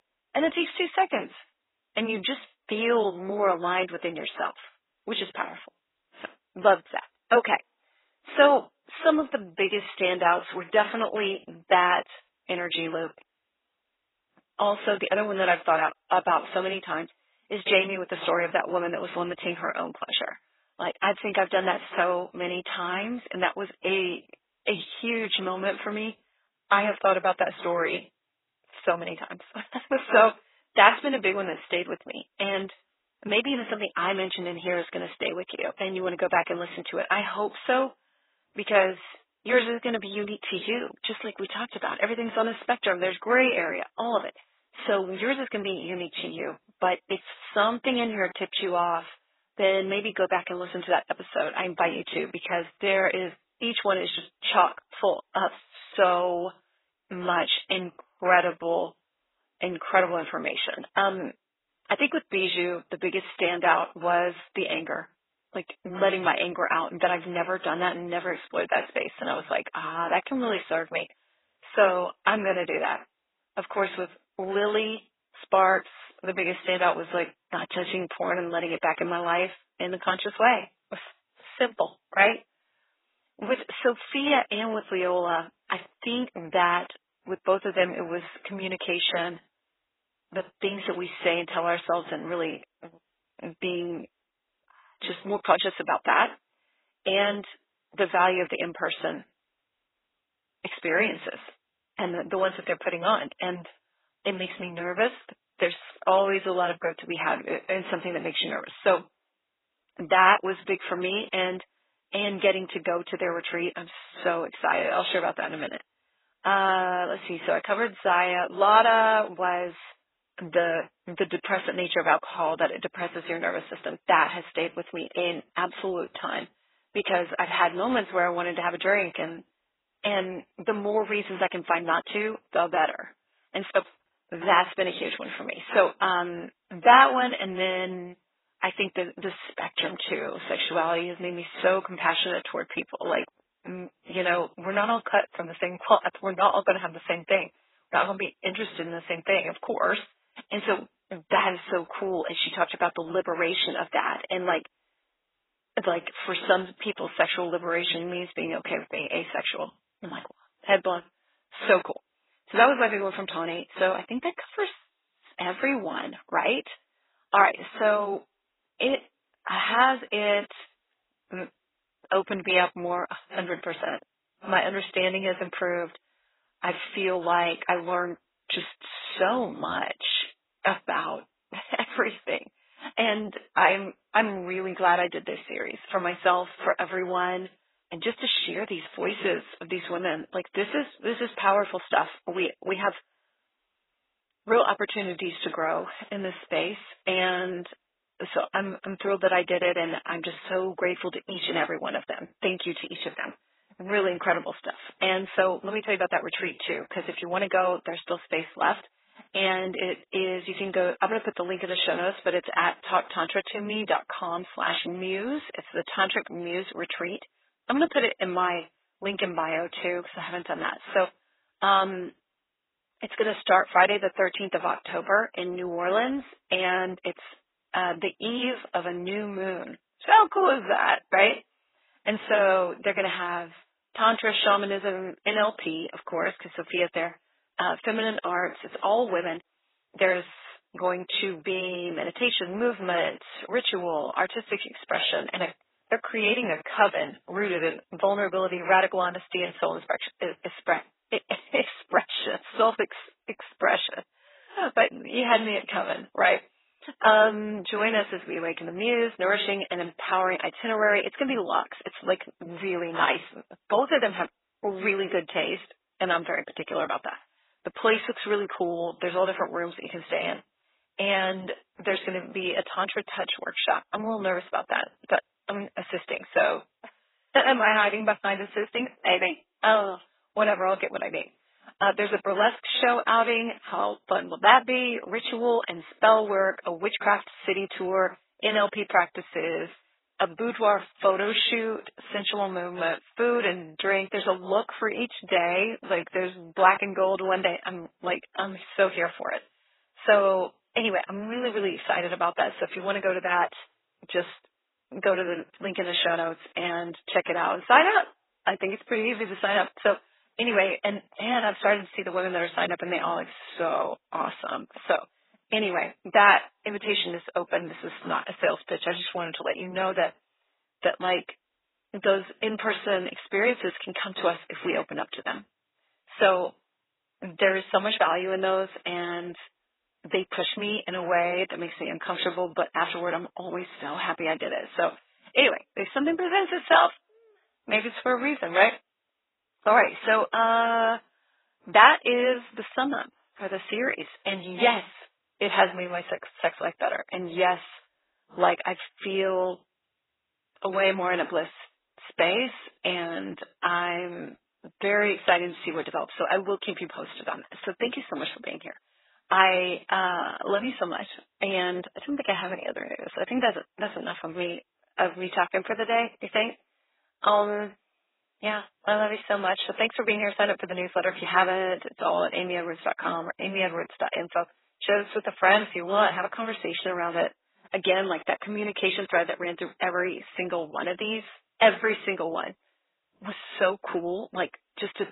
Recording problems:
garbled, watery; badly; nothing above 4 kHz
thin; very; fading below 550 Hz

